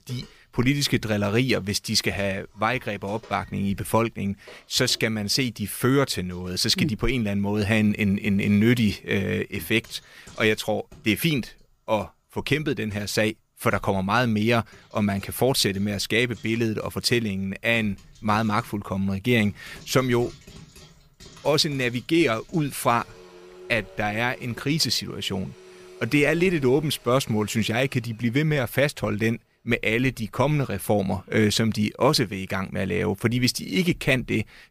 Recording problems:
household noises; faint; throughout; 25 dB below the speech

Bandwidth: 15 kHz